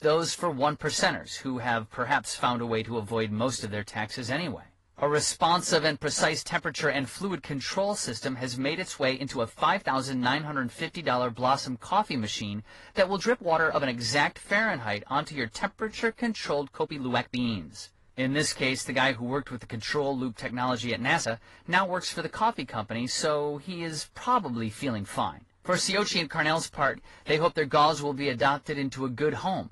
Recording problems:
garbled, watery; slightly; nothing above 11 kHz
uneven, jittery; strongly; from 5 to 29 s

